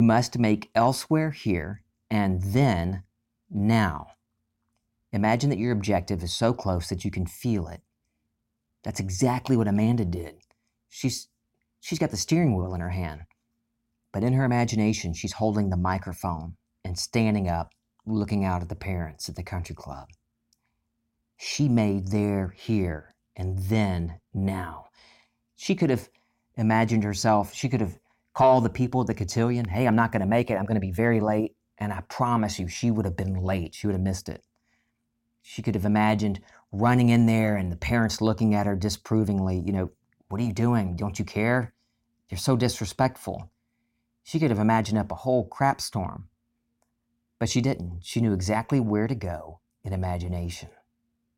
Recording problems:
abrupt cut into speech; at the start

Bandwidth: 16.5 kHz